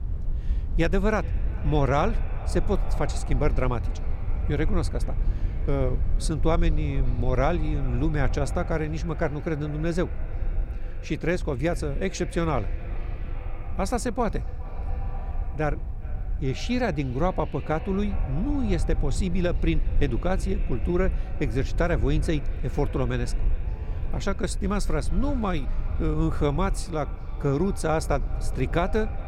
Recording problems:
echo of what is said; faint; throughout; 410 ms later, 20 dB below the speech
low rumble; noticeable; throughout; 20 dB below the speech

